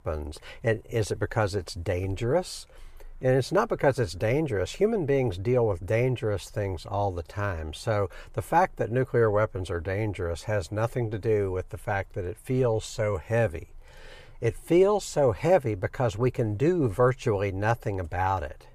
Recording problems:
none

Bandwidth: 15 kHz